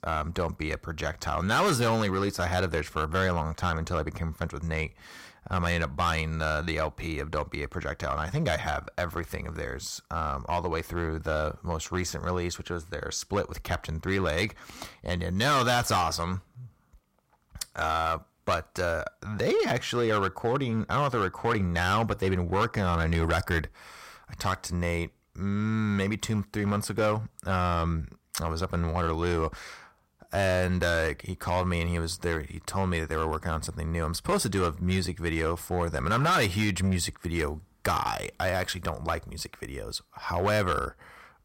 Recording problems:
distortion; slight; 5% of the sound clipped

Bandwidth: 16 kHz